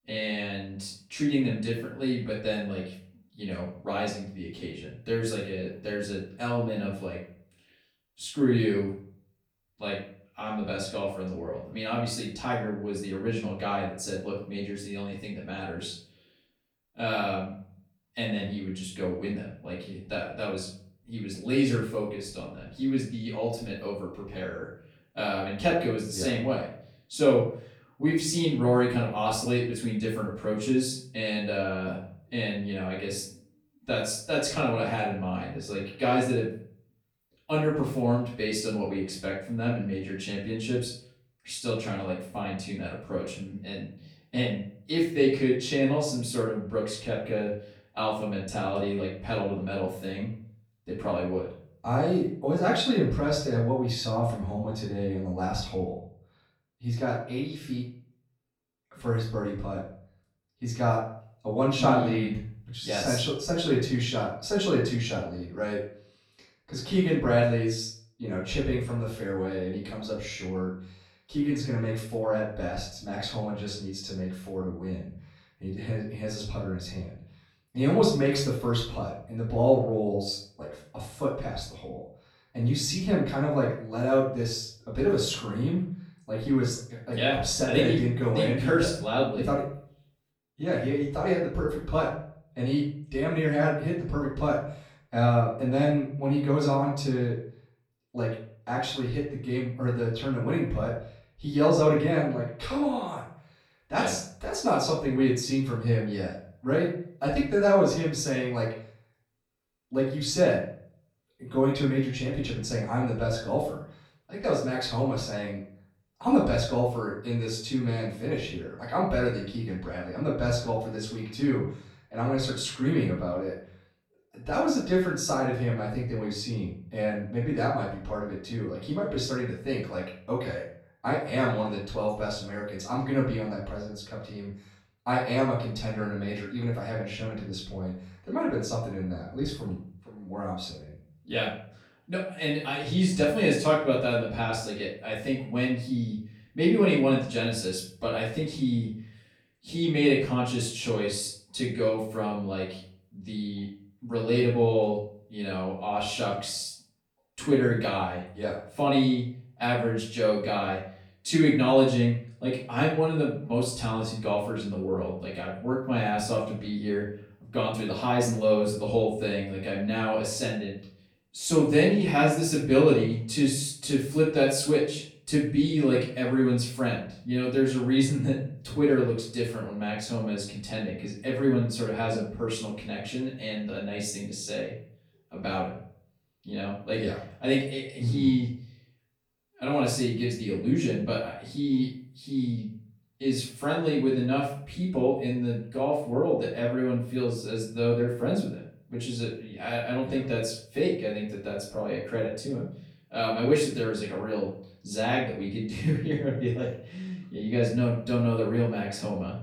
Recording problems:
off-mic speech; far
room echo; noticeable; dies away in 0.4 s

